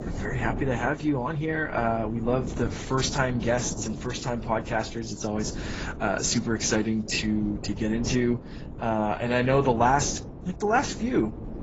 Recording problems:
garbled, watery; badly; nothing above 7.5 kHz
wind noise on the microphone; occasional gusts; 15 dB below the speech

